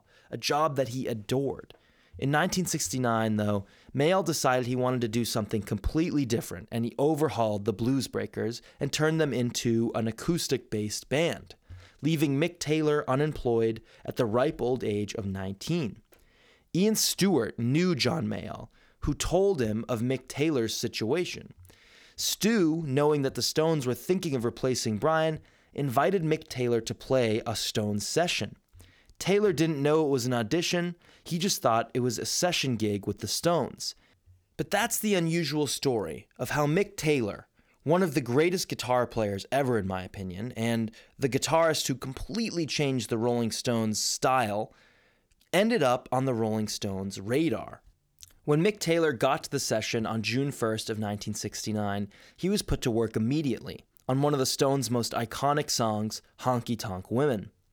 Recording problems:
none

